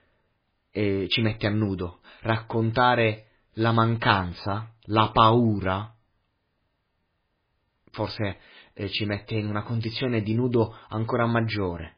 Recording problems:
garbled, watery; badly

